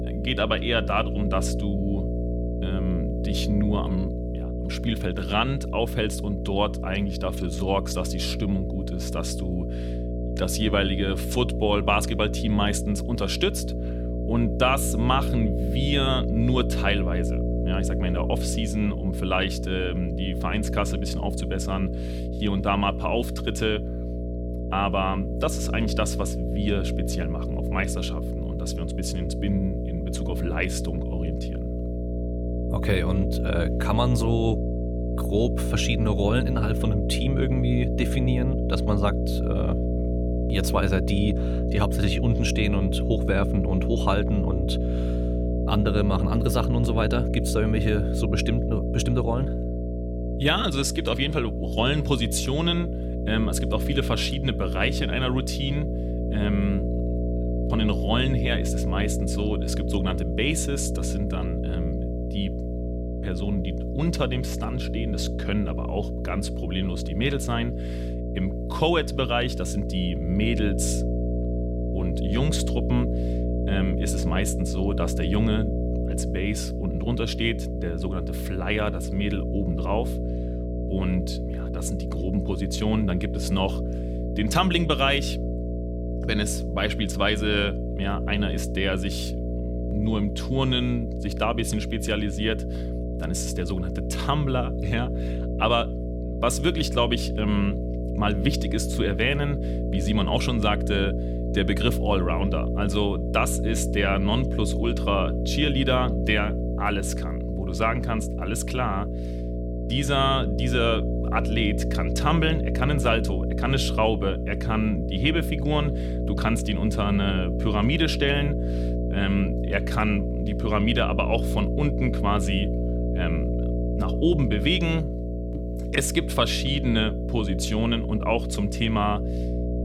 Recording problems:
electrical hum; loud; throughout; 60 Hz, 7 dB below the speech

